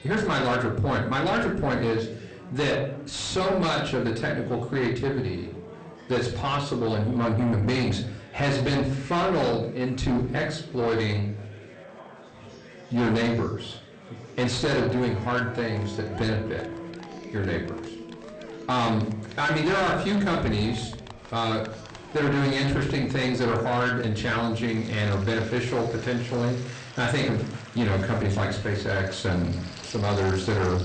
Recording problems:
distortion; heavy; 6 dB below the speech
room echo; slight; dies away in 0.4 s
off-mic speech; somewhat distant
garbled, watery; slightly; nothing above 8.5 kHz
background music; noticeable; throughout; 20 dB below the speech
chatter from many people; noticeable; throughout; 20 dB below the speech

